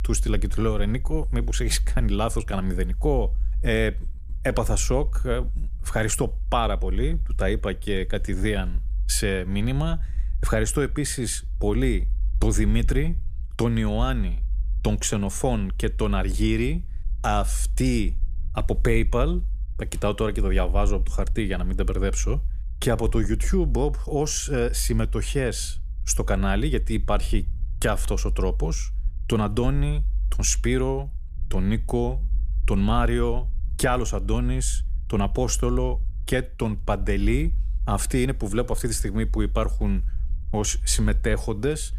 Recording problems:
low rumble; faint; throughout; 25 dB below the speech

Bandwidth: 14.5 kHz